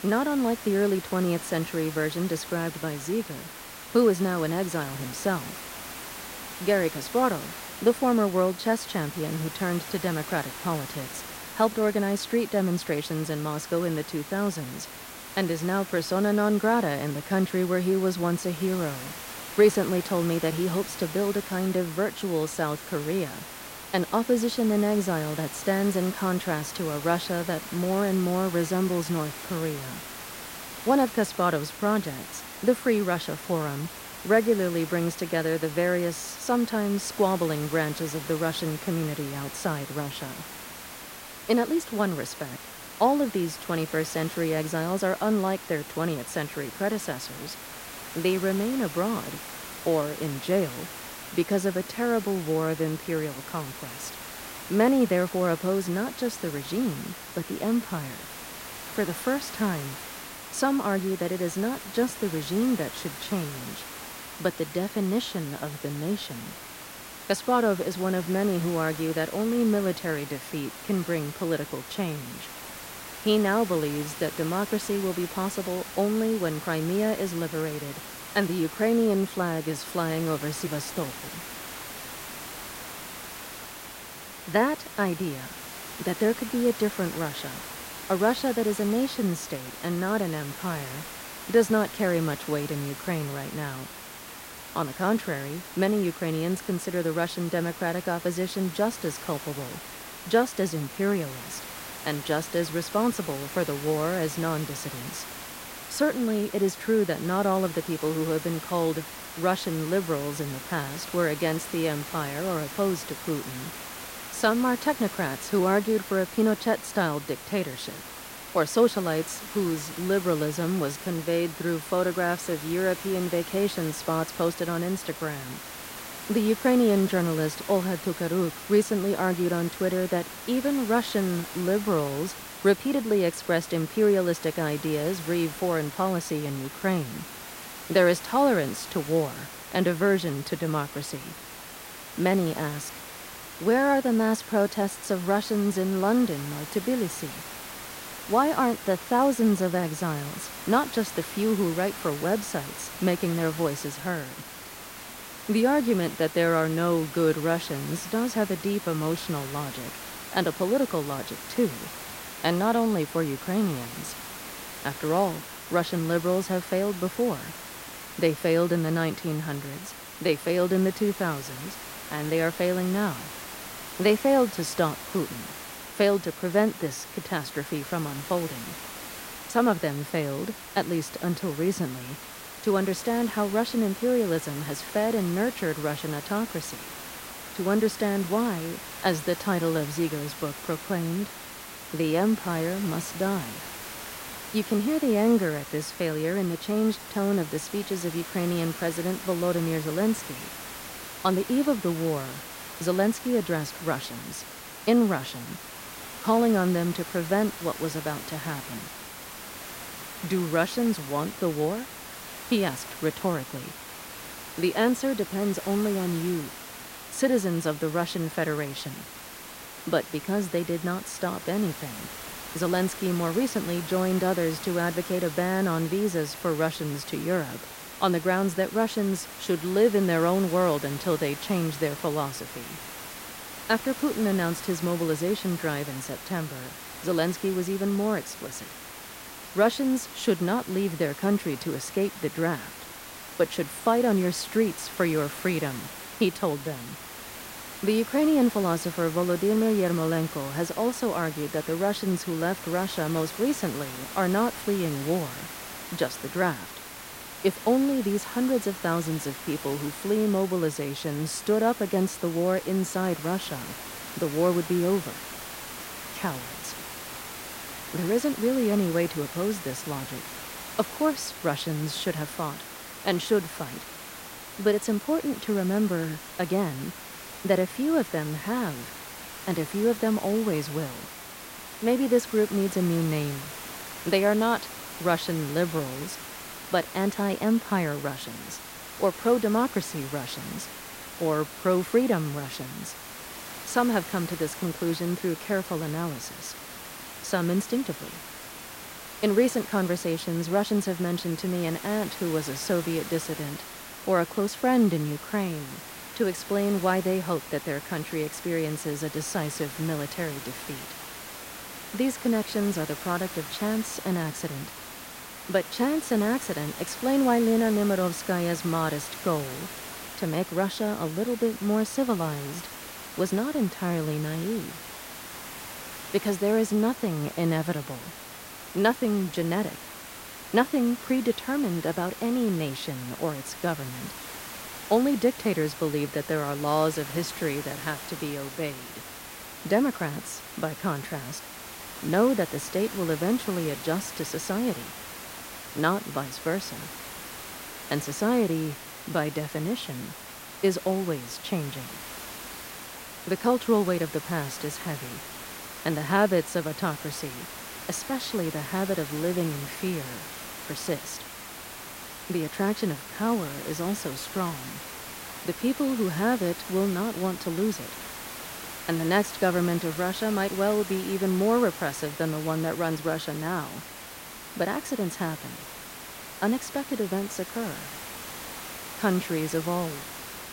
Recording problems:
hiss; noticeable; throughout; 10 dB below the speech

